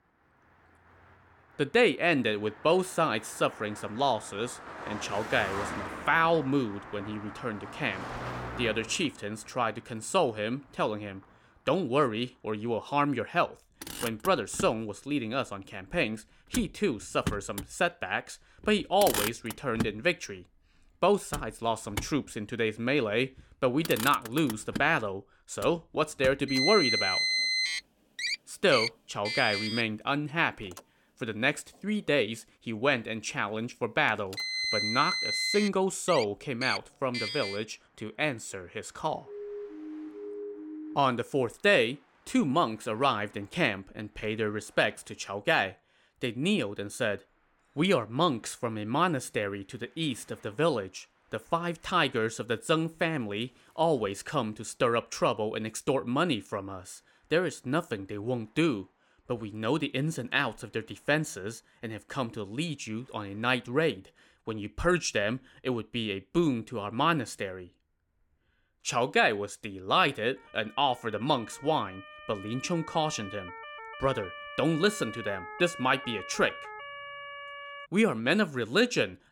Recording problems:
traffic noise; loud; throughout; 4 dB below the speech
siren; faint; from 39 to 41 s and from 1:10 to 1:18; peak 10 dB below the speech

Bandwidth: 17 kHz